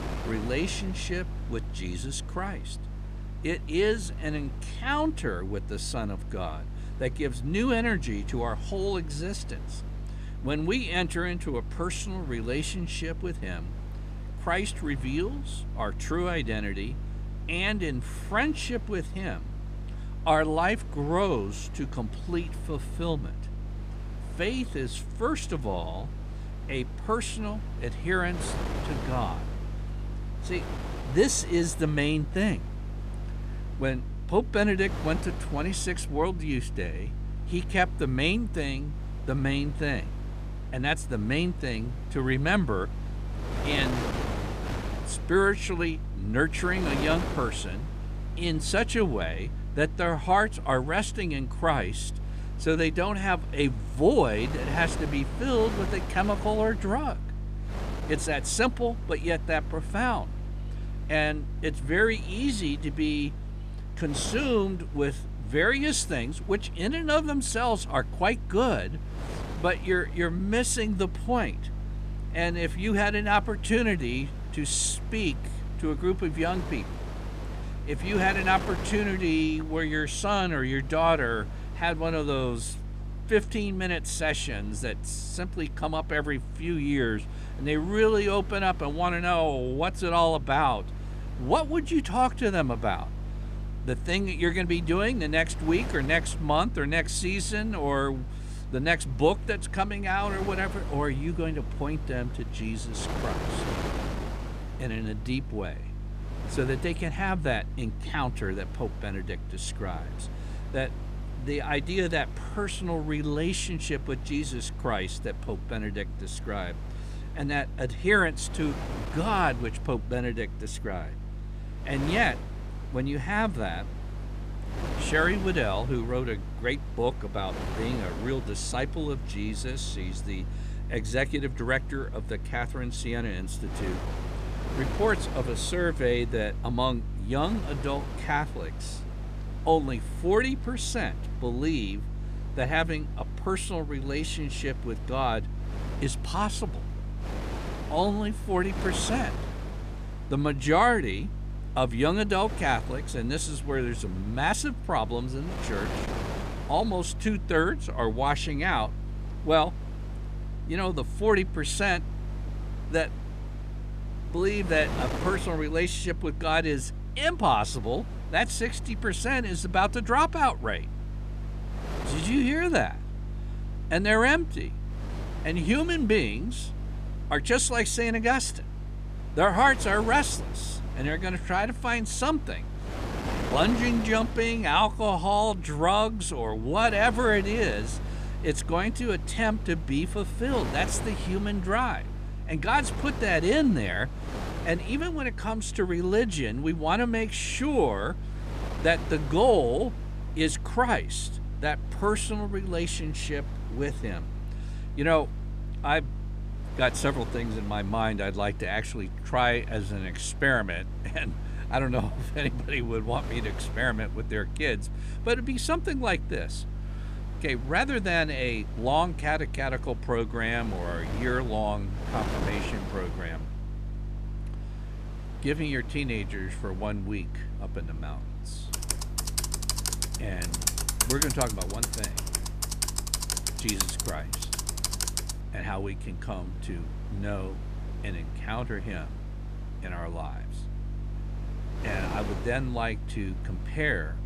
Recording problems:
wind noise on the microphone; occasional gusts; 15 dB below the speech
electrical hum; faint; throughout; 50 Hz, 25 dB below the speech
keyboard typing; loud; from 3:49 to 3:55; peak 4 dB above the speech

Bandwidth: 14.5 kHz